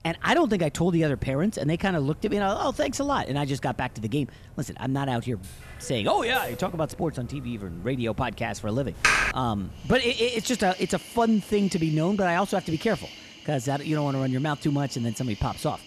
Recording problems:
animal sounds; noticeable; throughout; 15 dB below the speech
keyboard typing; loud; at 9 s; peak 6 dB above the speech

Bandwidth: 13.5 kHz